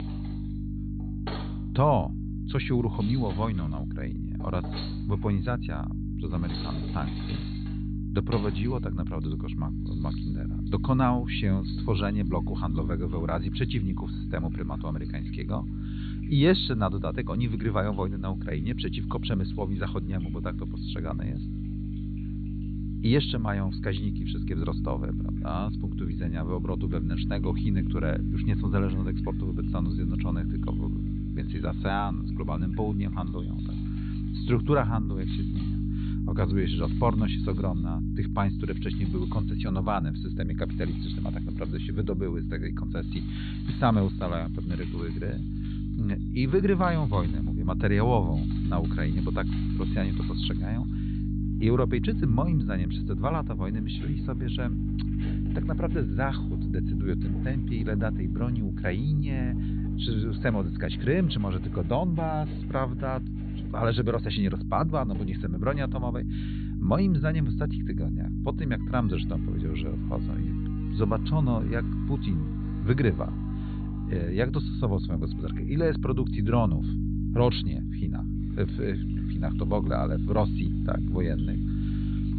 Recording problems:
high frequencies cut off; severe; nothing above 4.5 kHz
electrical hum; loud; throughout; 50 Hz, 7 dB below the speech
household noises; faint; throughout; 20 dB below the speech

